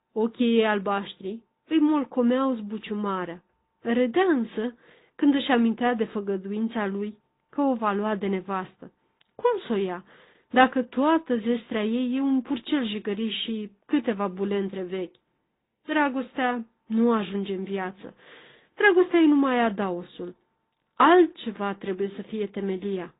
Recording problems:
high frequencies cut off; severe; nothing above 4 kHz
garbled, watery; slightly

